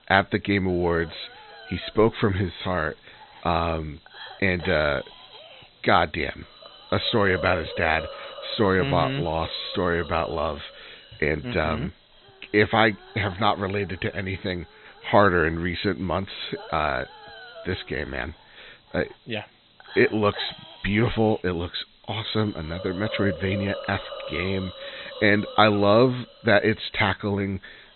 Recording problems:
high frequencies cut off; severe; nothing above 4 kHz
hiss; noticeable; throughout; 15 dB below the speech

